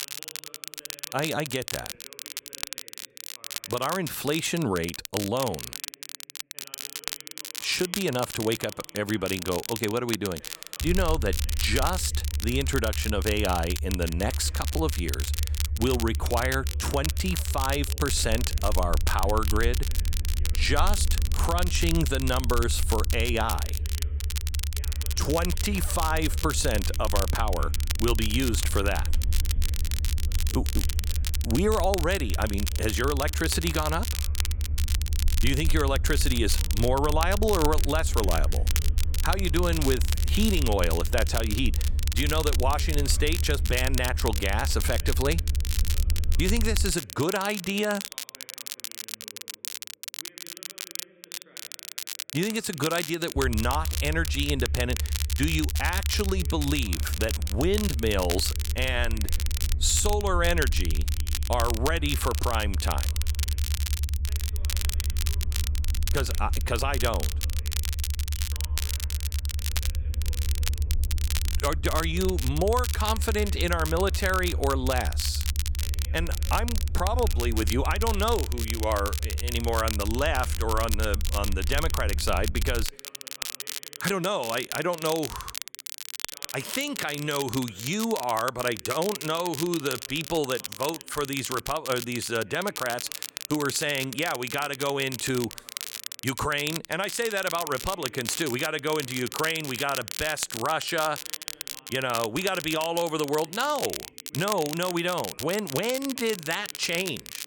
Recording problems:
crackle, like an old record; loud; 6 dB below the speech
low rumble; noticeable; from 11 to 47 s and from 53 s to 1:23; 20 dB below the speech
voice in the background; faint; throughout; 25 dB below the speech

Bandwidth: 18 kHz